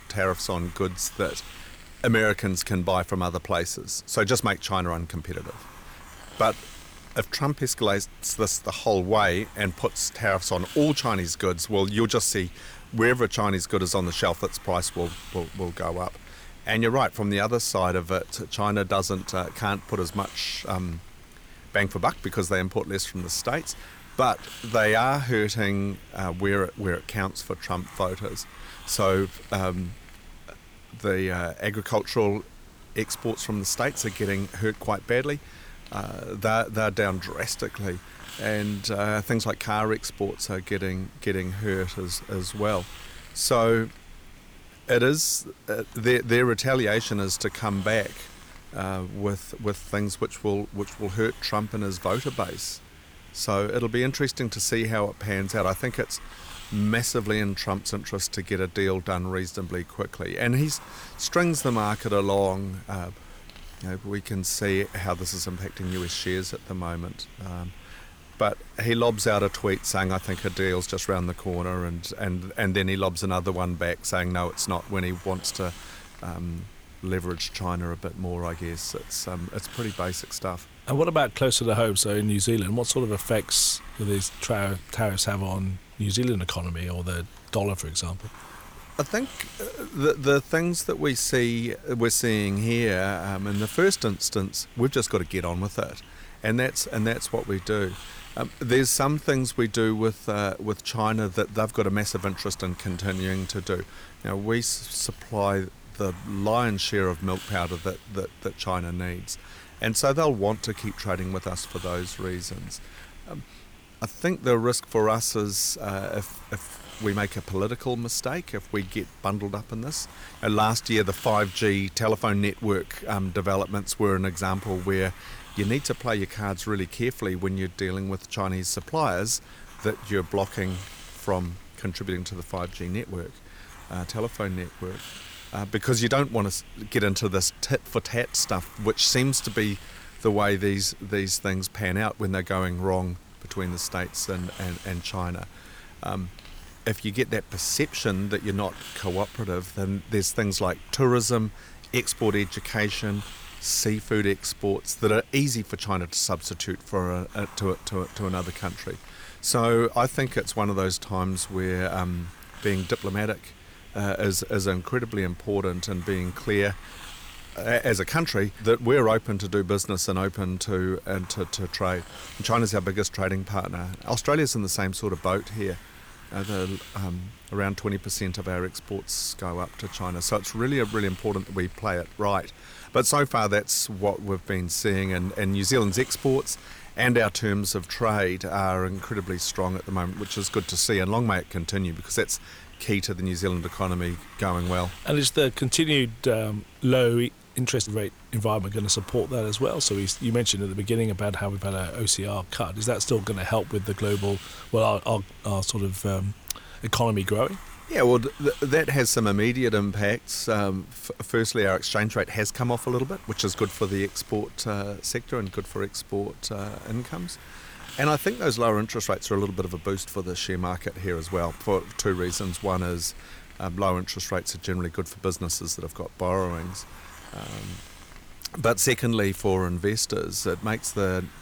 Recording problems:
hiss; noticeable; throughout; 20 dB below the speech

